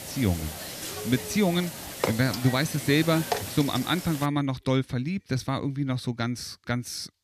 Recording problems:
hiss; loud; until 4.5 s; 7 dB below the speech

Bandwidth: 14.5 kHz